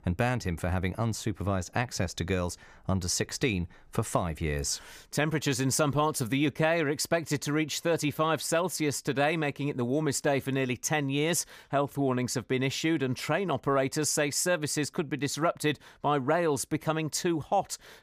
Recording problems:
none

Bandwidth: 15 kHz